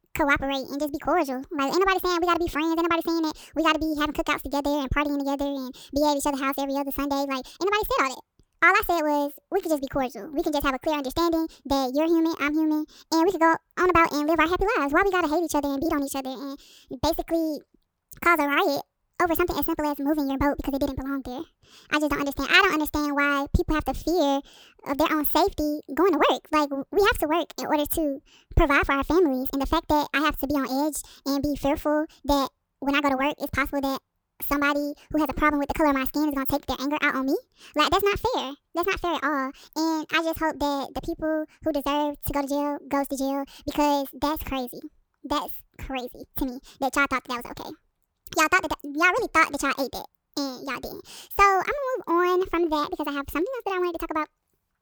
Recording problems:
wrong speed and pitch; too fast and too high; 1.7 times normal speed

